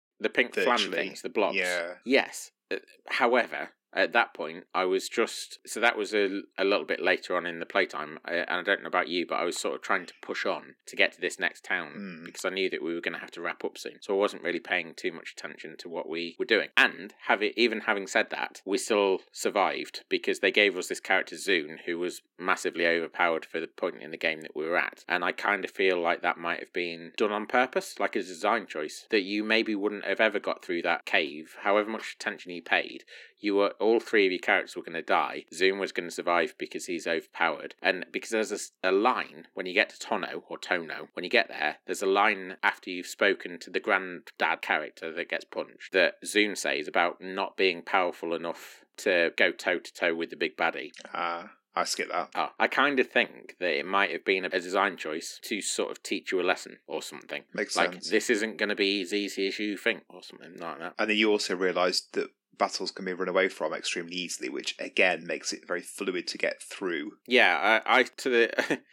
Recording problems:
thin; somewhat; fading below 250 Hz

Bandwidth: 16.5 kHz